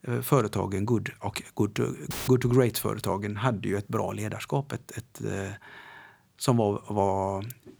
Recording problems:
audio cutting out; filled with static; at 2 s

